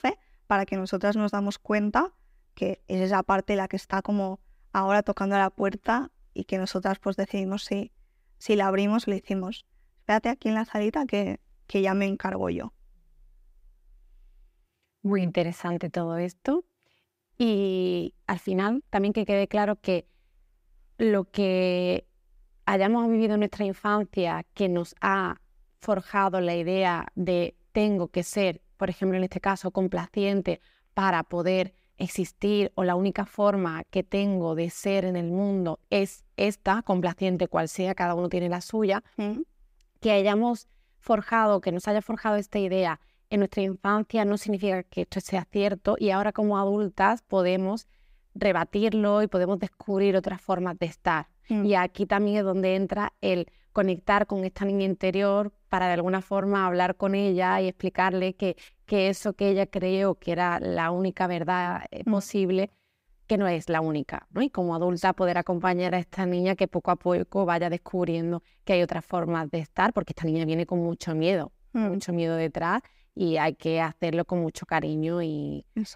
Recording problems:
uneven, jittery; strongly; from 2.5 s to 1:14

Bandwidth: 15.5 kHz